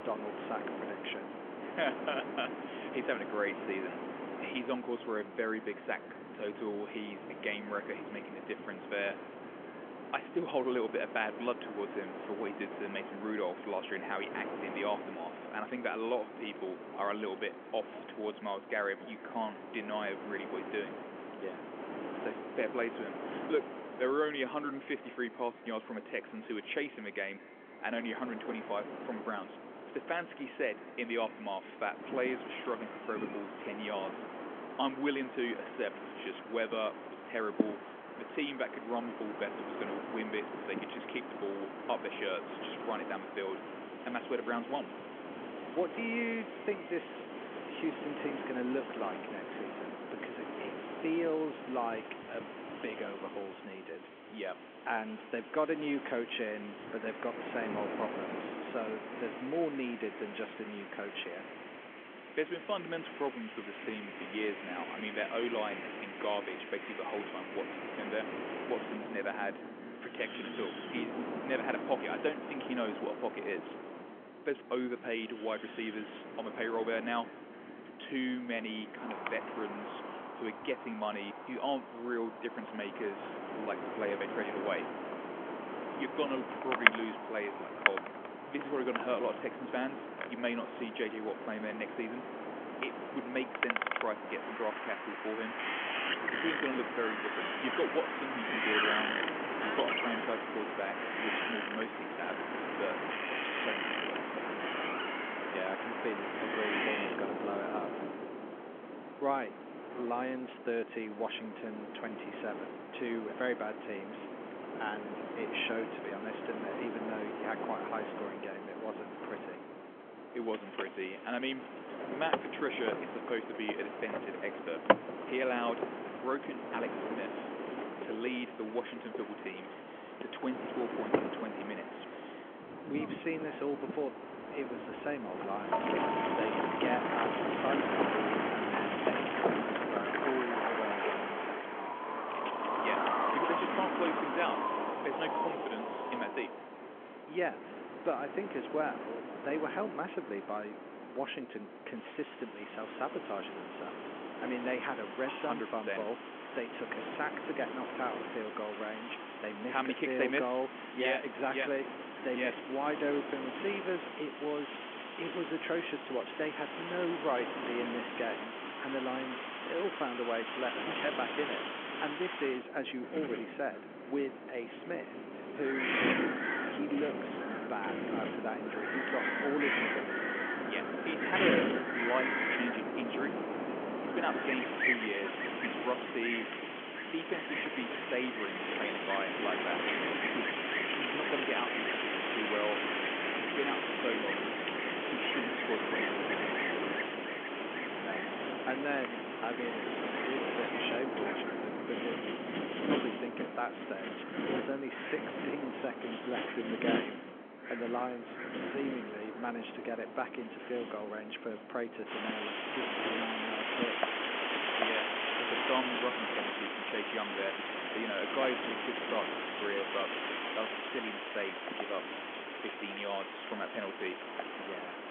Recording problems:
echo of what is said; faint; throughout; 210 ms later, 25 dB below the speech
phone-call audio; nothing above 3.5 kHz
wind in the background; very loud; throughout; 1 dB above the speech

